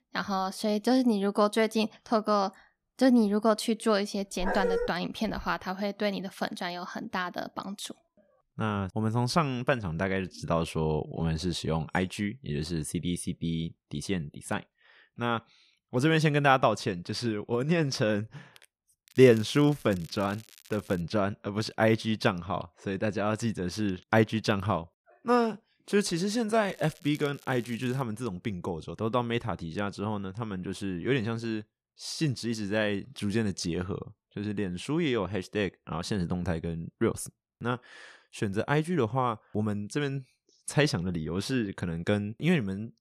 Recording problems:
crackling; faint; from 19 to 21 s and from 27 to 28 s; 25 dB below the speech
dog barking; noticeable; at 4.5 s; peak level with the speech

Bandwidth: 14.5 kHz